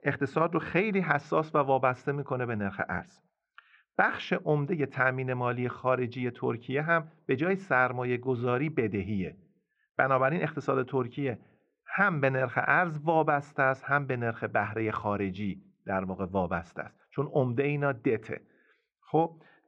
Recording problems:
muffled; very; fading above 2 kHz

